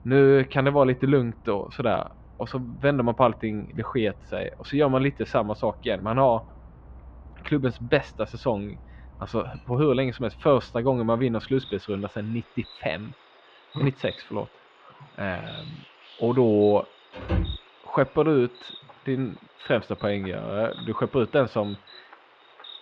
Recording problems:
muffled; very; fading above 3 kHz
animal sounds; faint; throughout; 20 dB below the speech
door banging; noticeable; at 17 s; peak 3 dB below the speech

